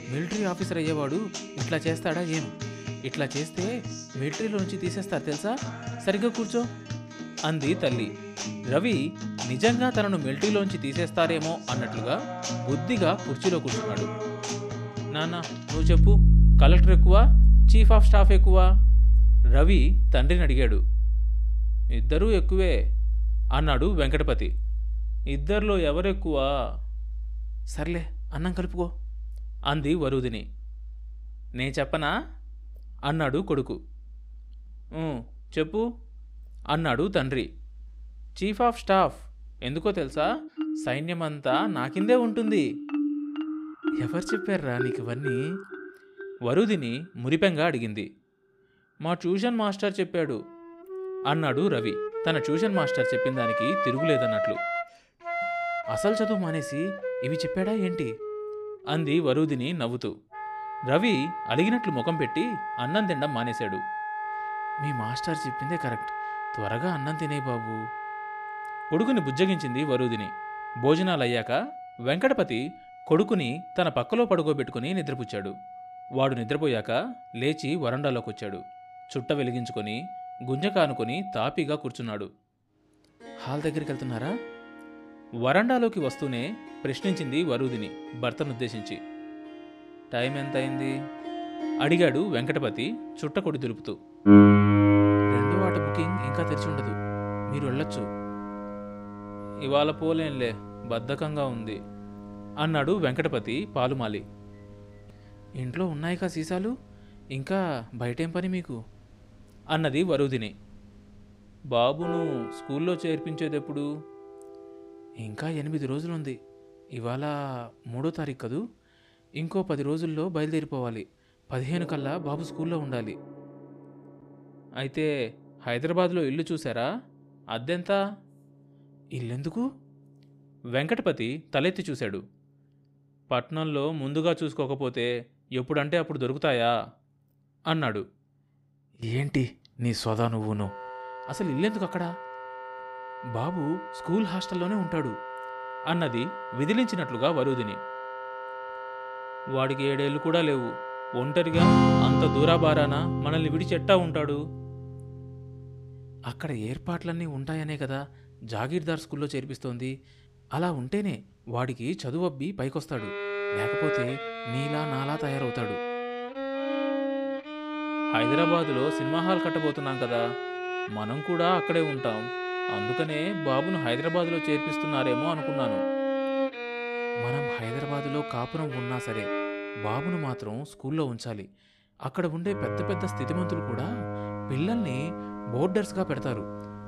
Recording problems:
background music; loud; throughout; as loud as the speech

